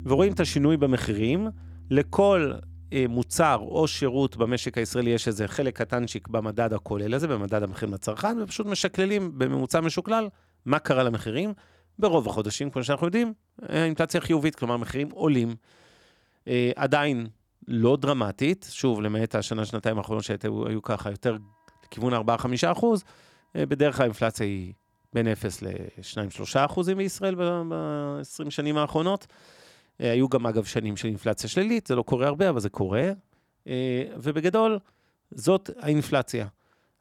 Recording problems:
background music; faint; throughout; 20 dB below the speech

